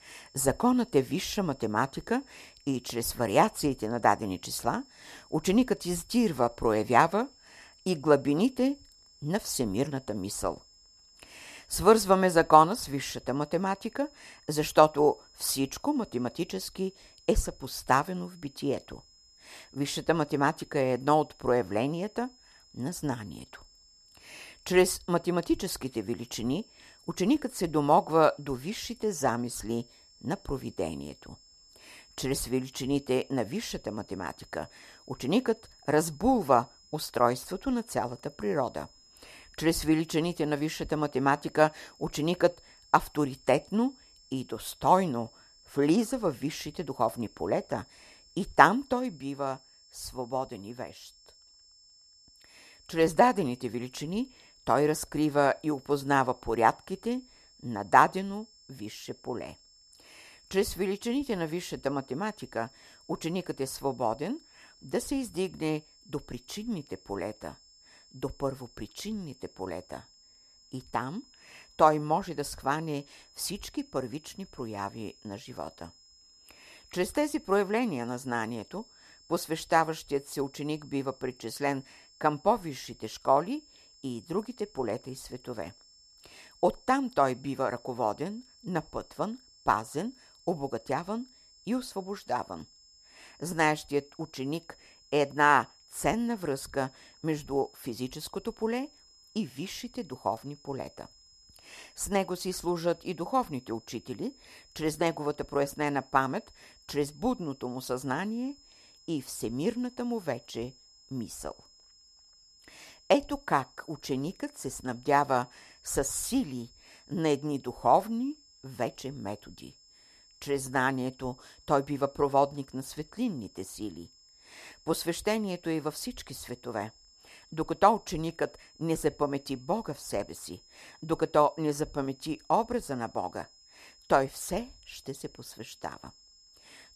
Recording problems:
high-pitched whine; faint; throughout; 5 kHz, 25 dB below the speech

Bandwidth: 14 kHz